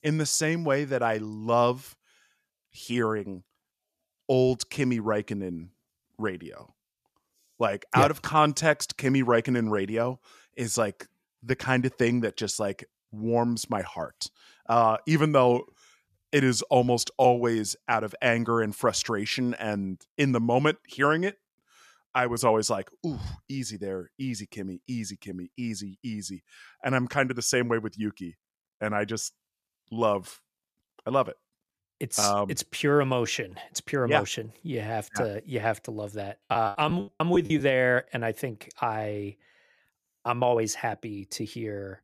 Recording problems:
choppy; very; from 37 to 38 s; 21% of the speech affected

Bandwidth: 14.5 kHz